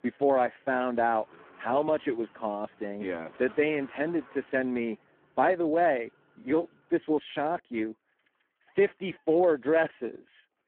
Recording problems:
phone-call audio; poor line
traffic noise; faint; throughout; 25 dB below the speech

